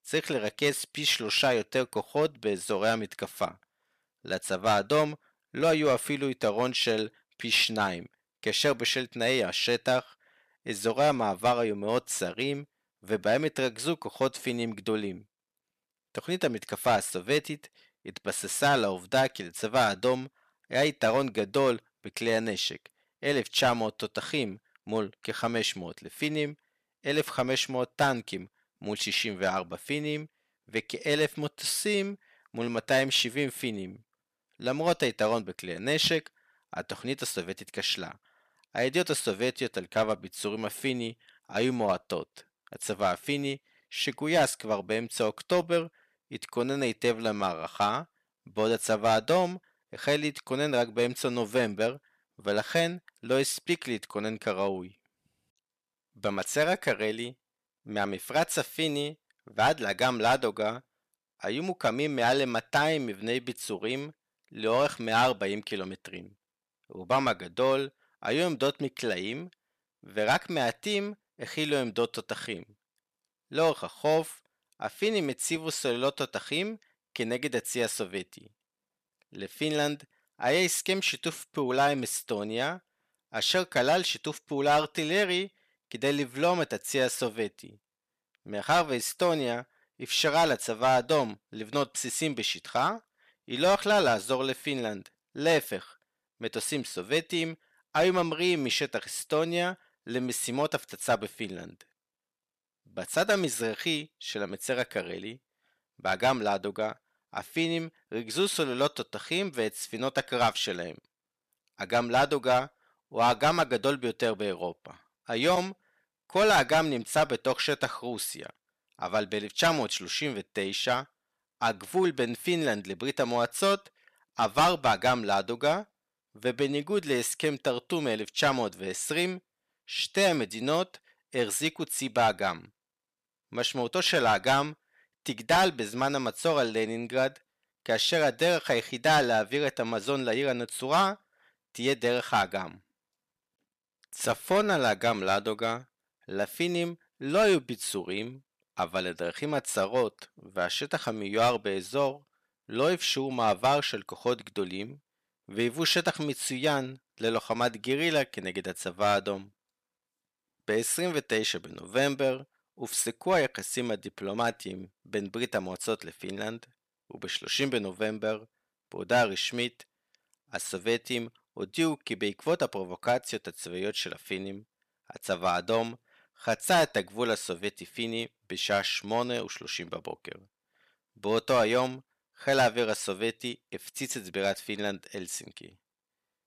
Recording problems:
distortion; slight; 2% of the sound clipped

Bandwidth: 14.5 kHz